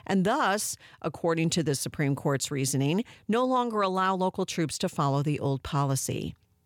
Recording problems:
none

